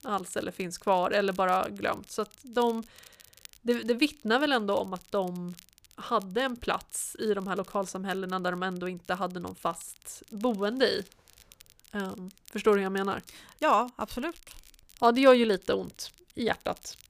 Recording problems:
crackle, like an old record; faint; 25 dB below the speech

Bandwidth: 15 kHz